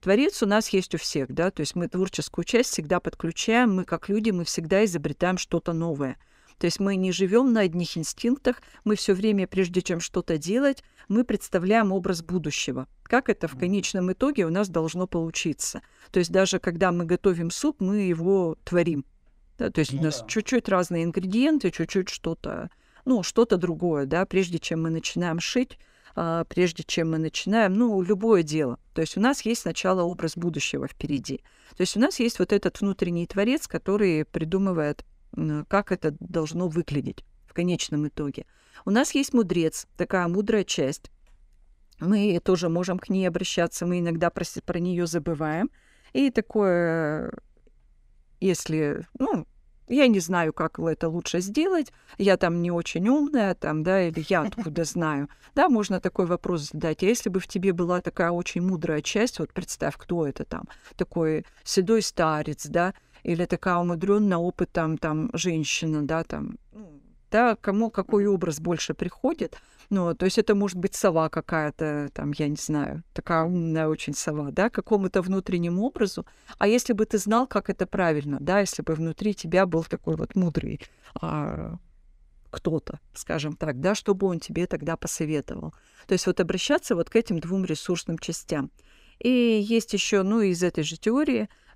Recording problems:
none

